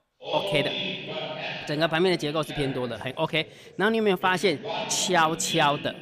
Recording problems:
background chatter; loud; throughout; 2 voices, 7 dB below the speech

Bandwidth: 15 kHz